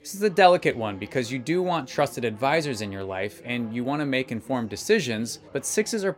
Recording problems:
chatter from many people; faint; throughout; 25 dB below the speech

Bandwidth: 16 kHz